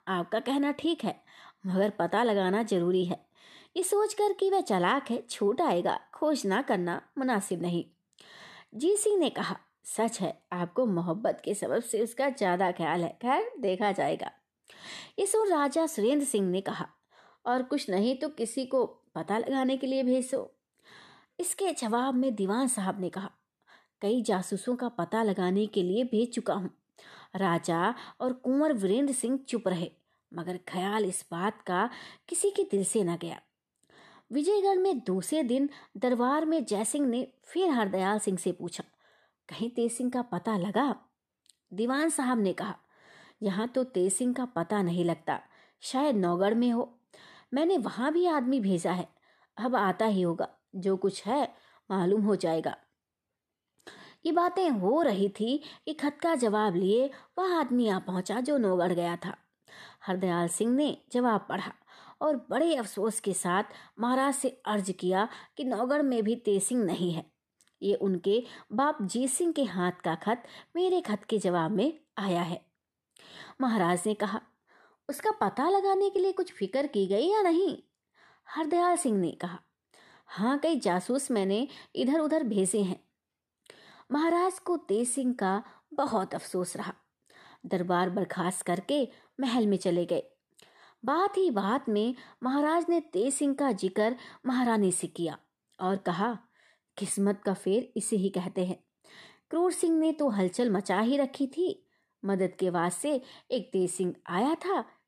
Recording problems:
none

